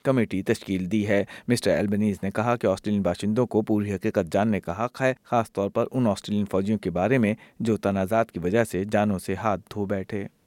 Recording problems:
none

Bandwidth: 16.5 kHz